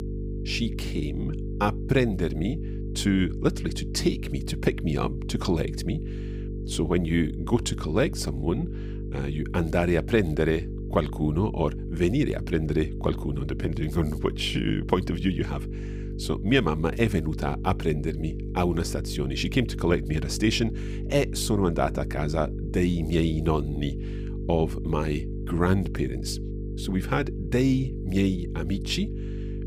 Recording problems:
electrical hum; noticeable; throughout; 50 Hz, 10 dB below the speech

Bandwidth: 15.5 kHz